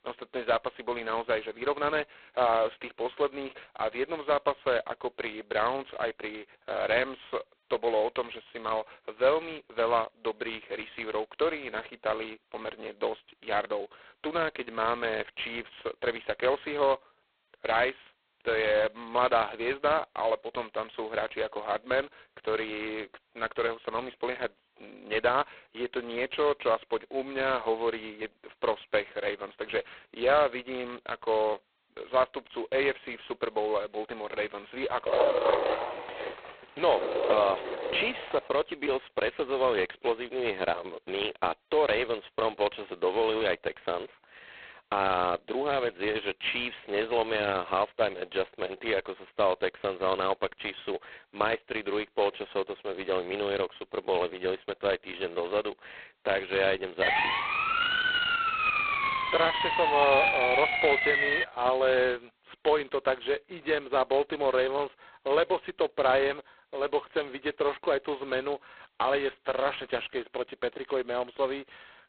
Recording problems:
phone-call audio; poor line; nothing above 4 kHz
dog barking; loud; from 35 to 38 s; peak 6 dB above the speech
siren; loud; from 57 s to 1:01; peak 6 dB above the speech

